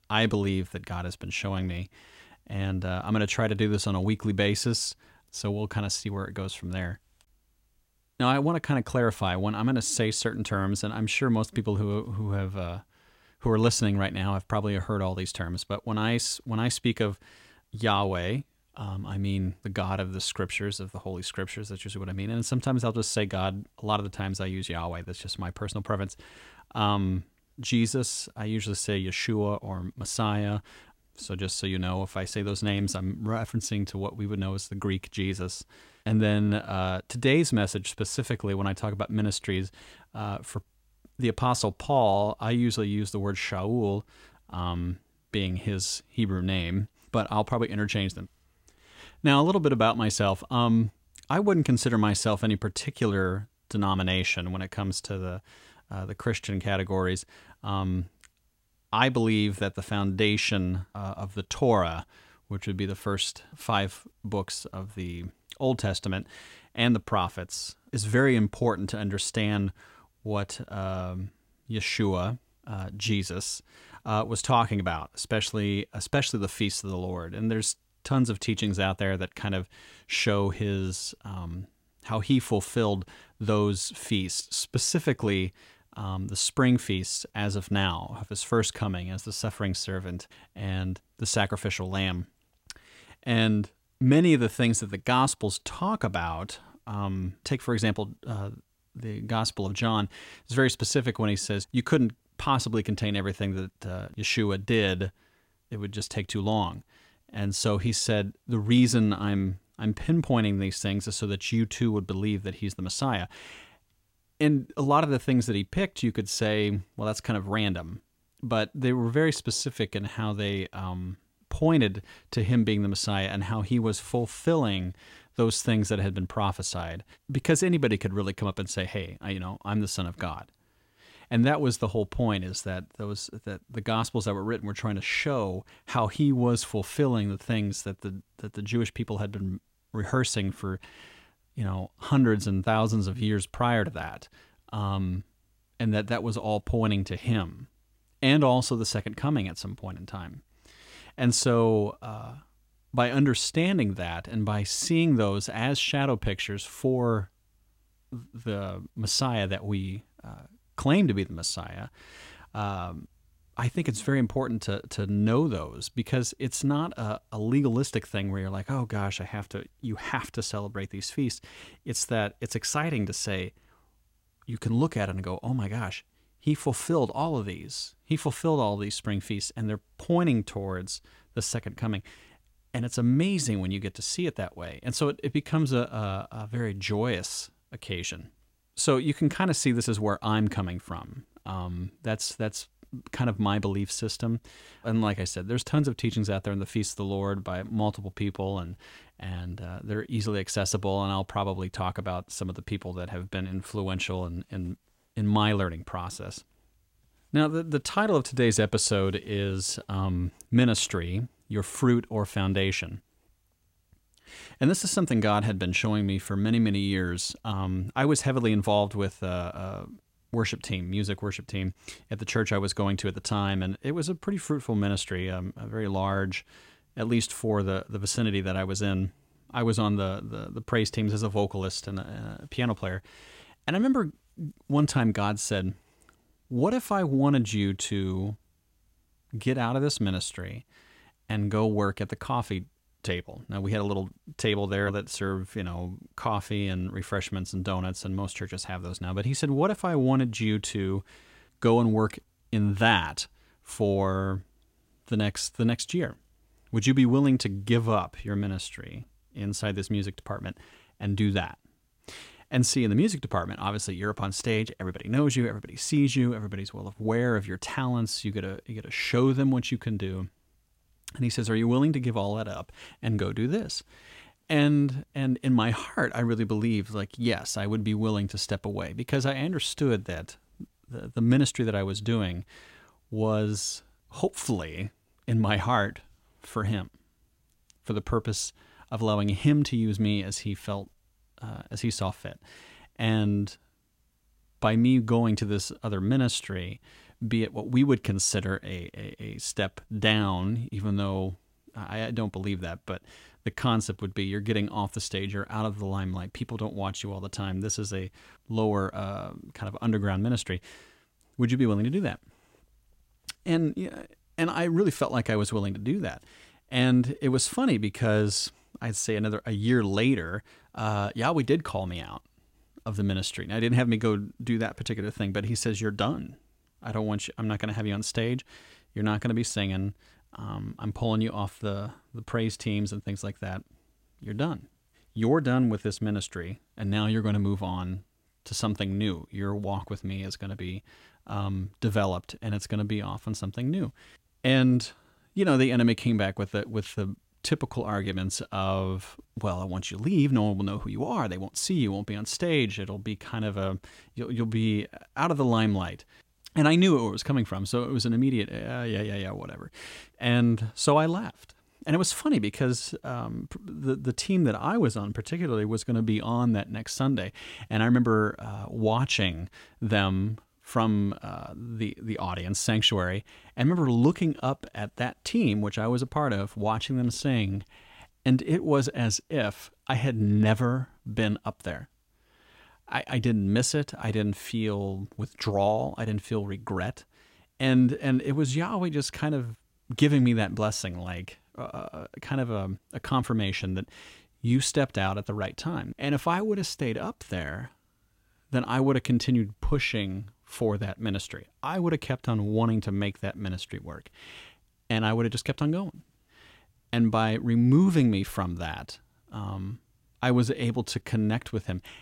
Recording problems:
none

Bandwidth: 16 kHz